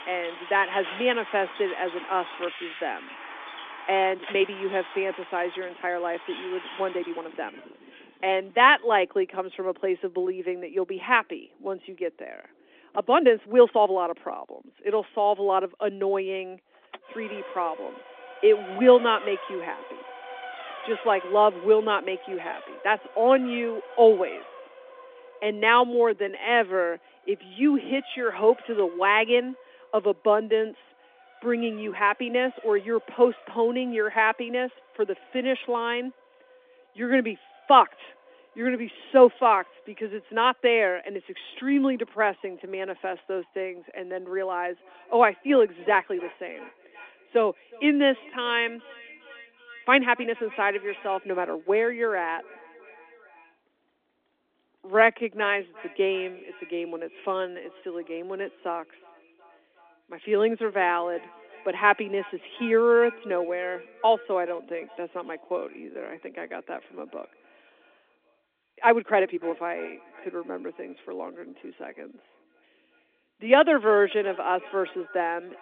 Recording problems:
echo of what is said; faint; from 45 s on; 360 ms later, 25 dB below the speech
phone-call audio; nothing above 3.5 kHz
traffic noise; noticeable; throughout; 15 dB below the speech
uneven, jittery; strongly; from 3.5 s to 1:10

